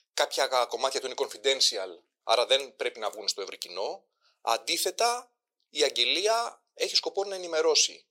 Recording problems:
thin; very; fading below 450 Hz

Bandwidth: 16 kHz